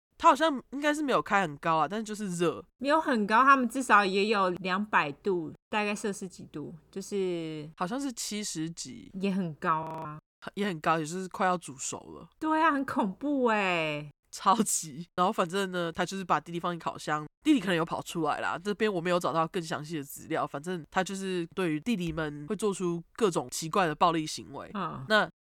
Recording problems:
audio freezing; at 10 s

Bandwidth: 18 kHz